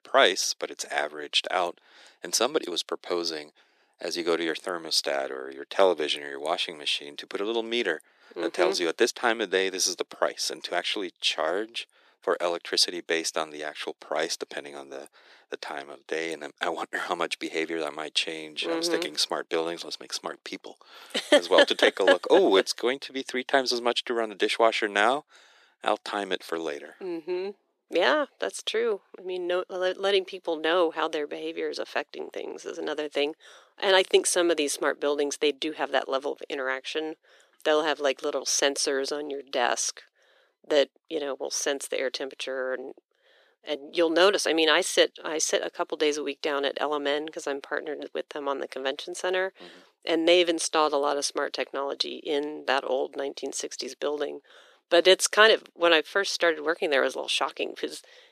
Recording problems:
thin; very; fading below 350 Hz

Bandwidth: 14.5 kHz